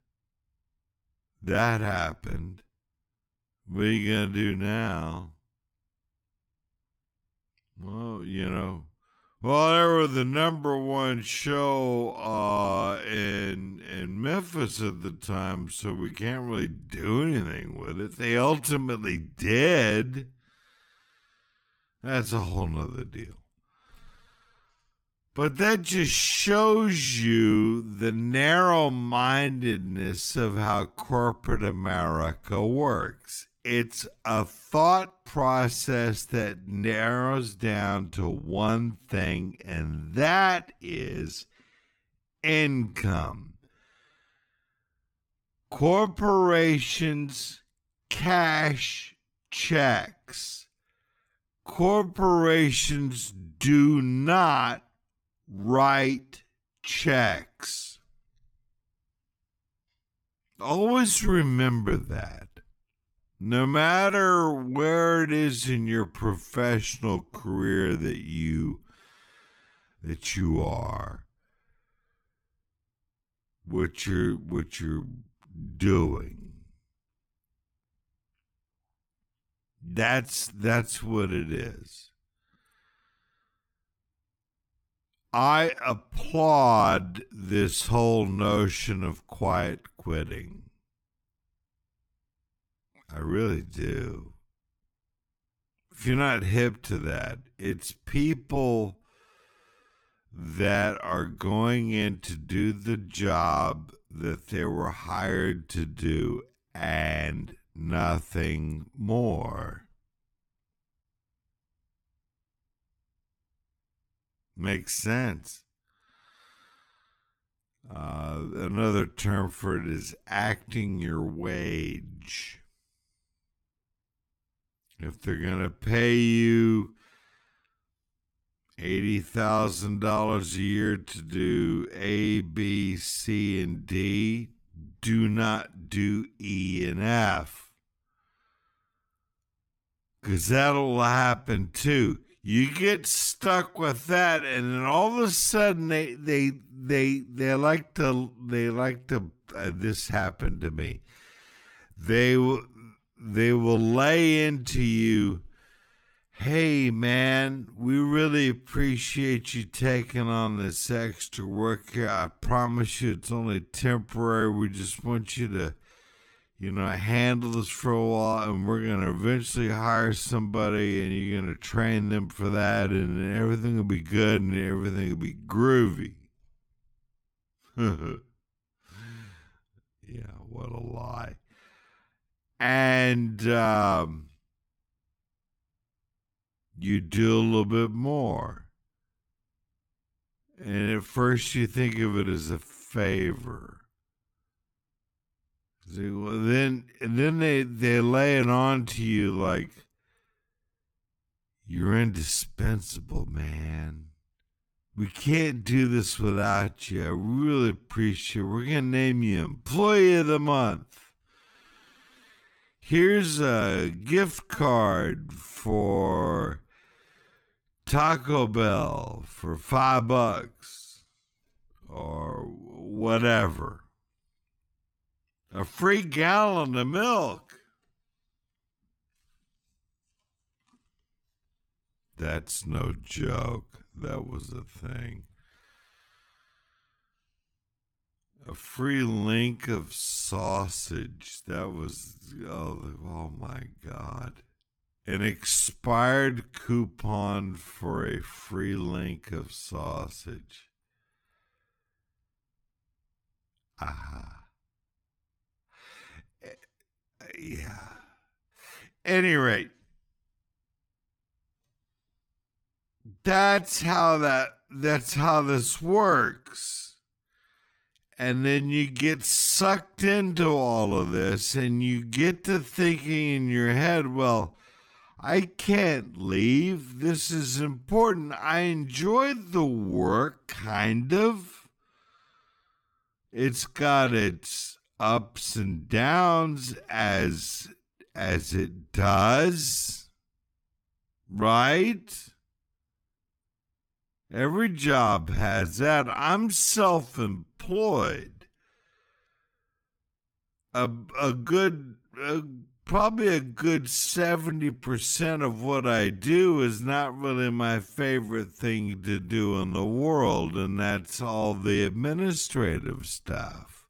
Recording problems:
wrong speed, natural pitch; too slow; 0.5 times normal speed

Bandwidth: 18 kHz